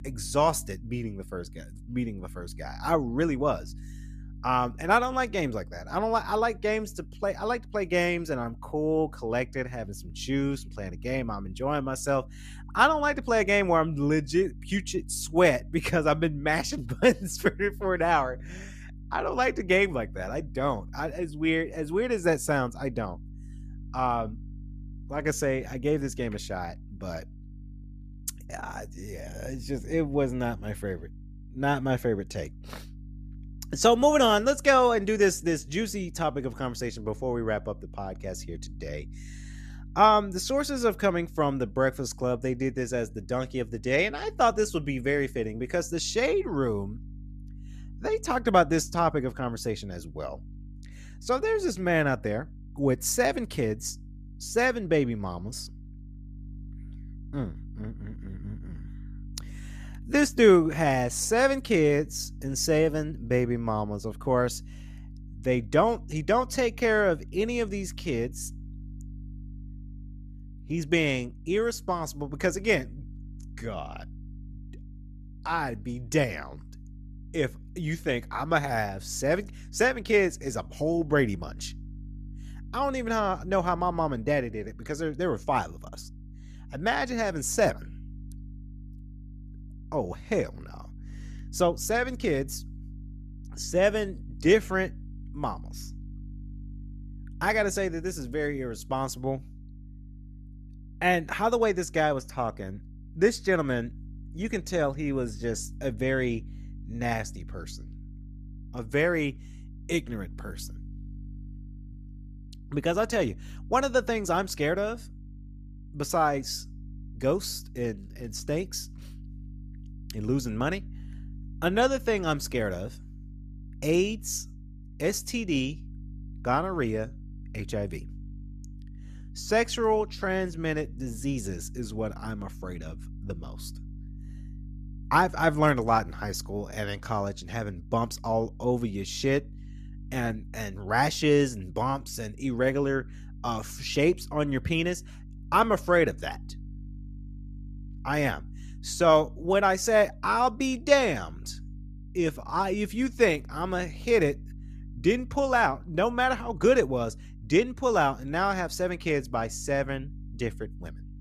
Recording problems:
electrical hum; faint; throughout; 50 Hz, 30 dB below the speech

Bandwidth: 14.5 kHz